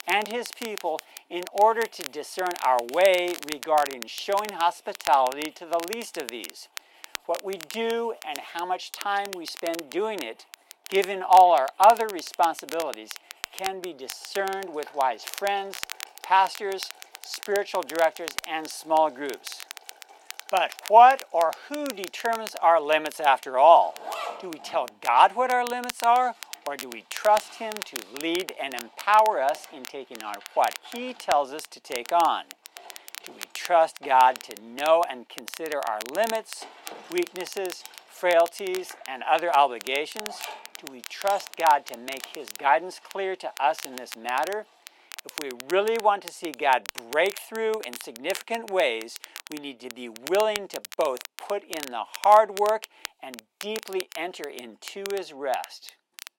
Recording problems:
thin; very; fading below 350 Hz
crackle, like an old record; noticeable; 15 dB below the speech
household noises; faint; throughout; 25 dB below the speech

